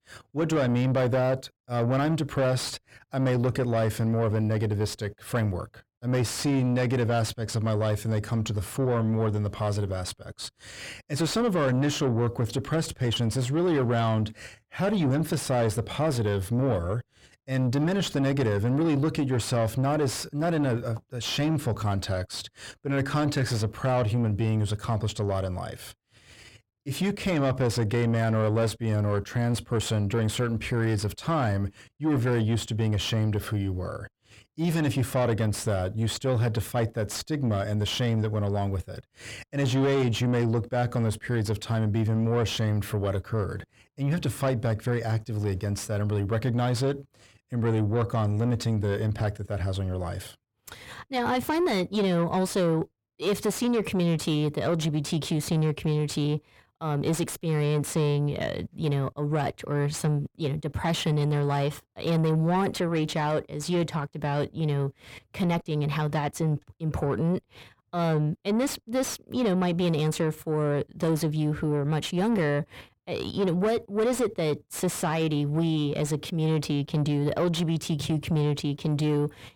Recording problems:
distortion; slight; 10 dB below the speech

